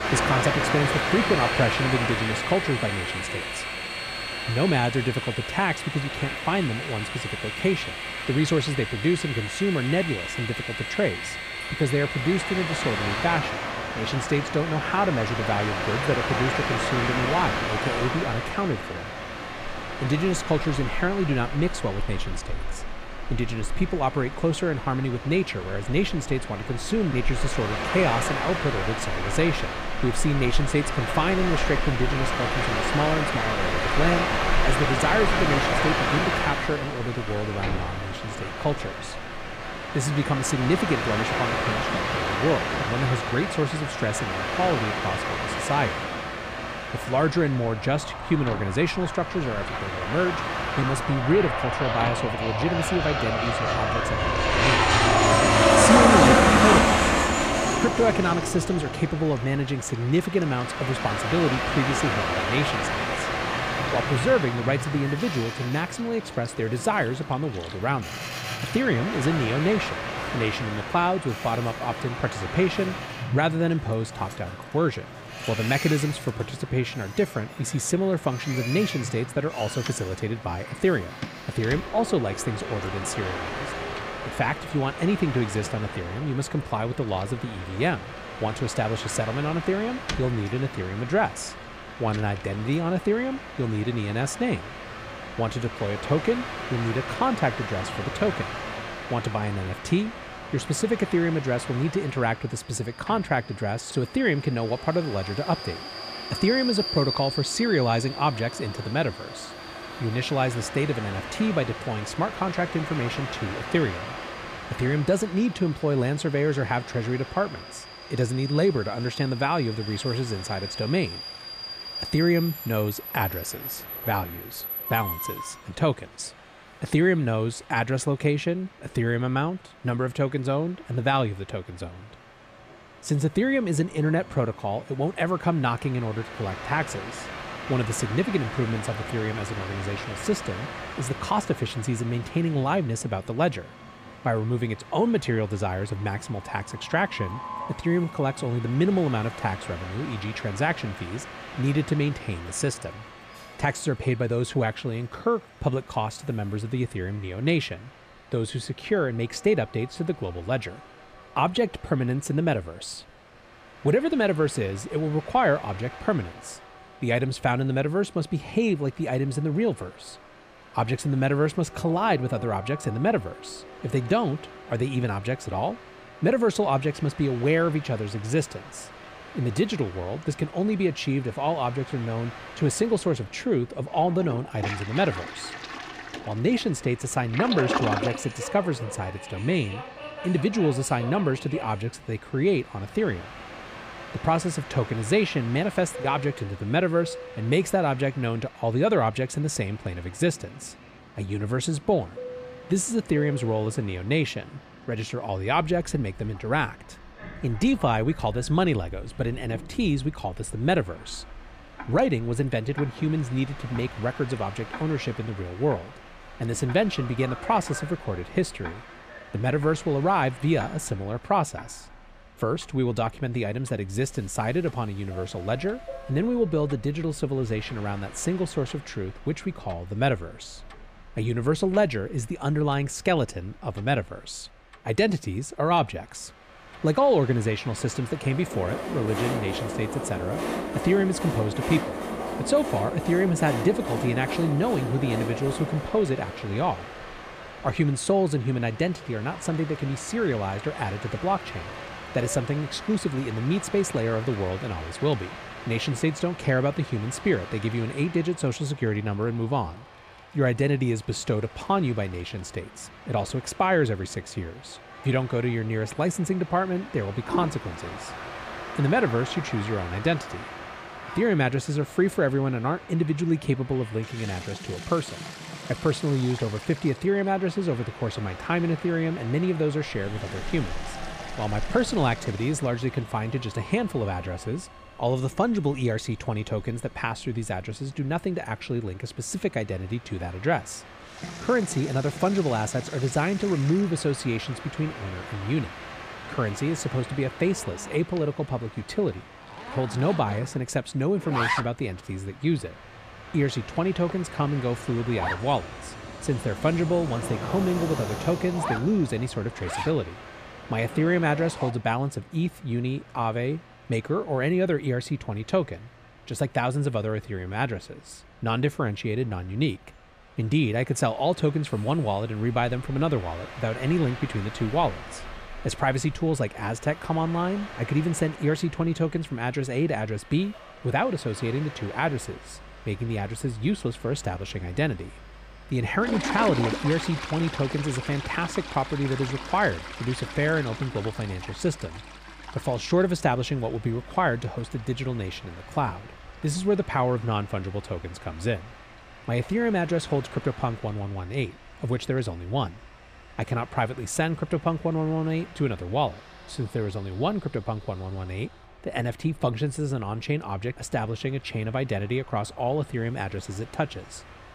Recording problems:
train or aircraft noise; loud; throughout; 3 dB below the speech
household noises; noticeable; throughout; 15 dB below the speech

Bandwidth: 15 kHz